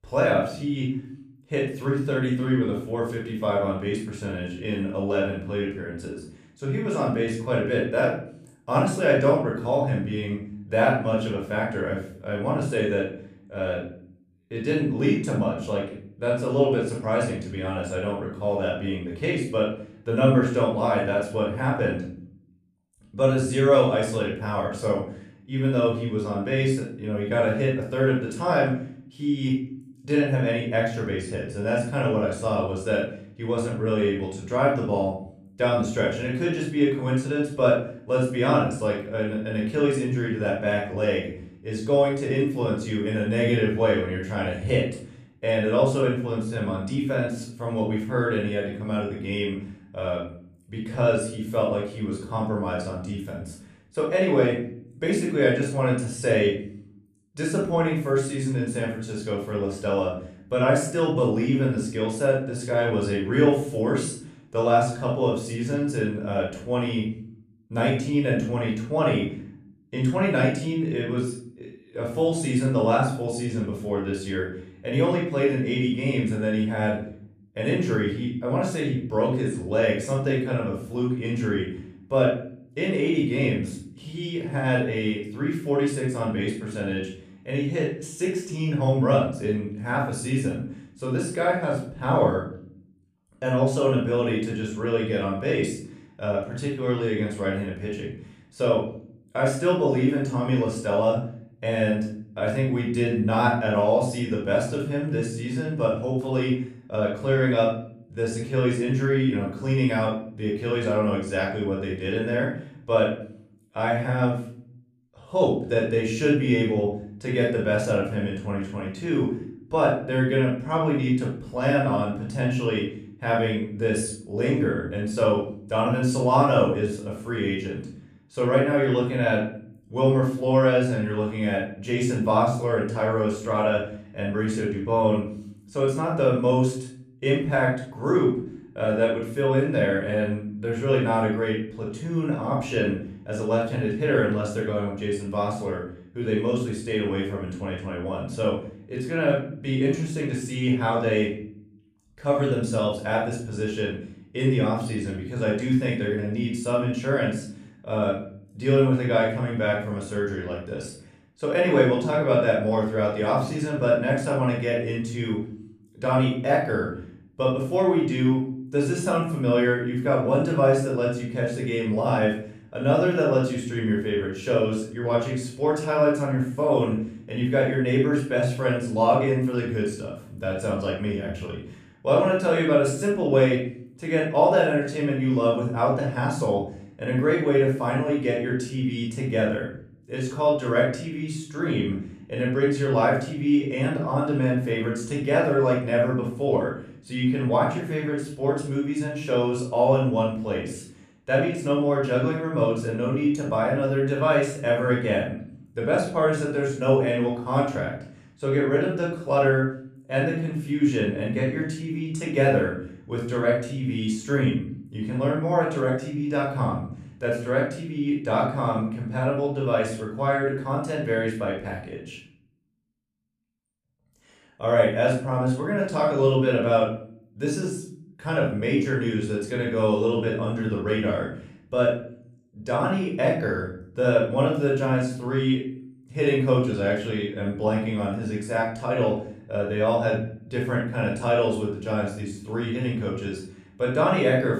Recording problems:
off-mic speech; far
room echo; noticeable; dies away in 0.5 s

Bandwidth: 14.5 kHz